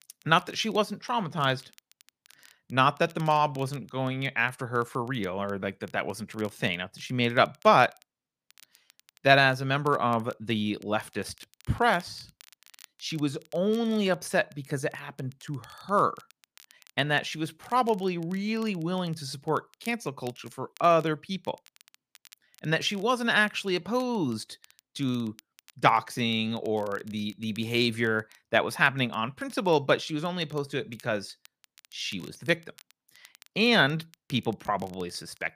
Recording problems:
crackle, like an old record; faint; 30 dB below the speech

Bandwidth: 15 kHz